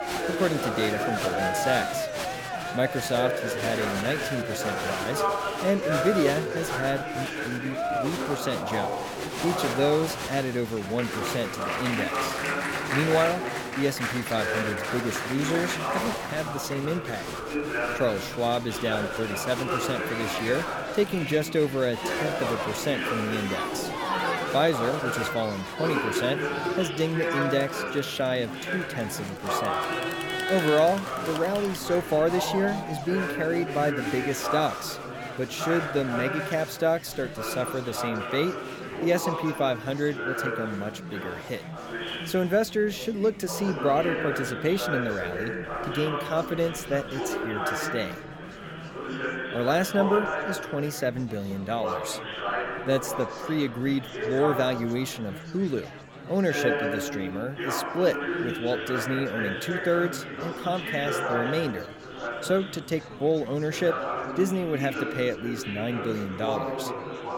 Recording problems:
murmuring crowd; loud; throughout; 2 dB below the speech

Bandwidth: 17.5 kHz